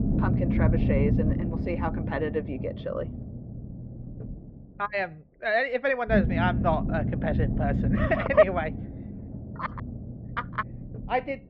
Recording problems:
muffled; very; fading above 3 kHz
low rumble; loud; throughout; 10 dB below the speech

